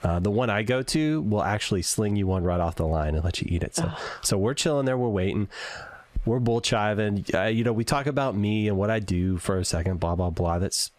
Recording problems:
squashed, flat; heavily

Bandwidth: 15 kHz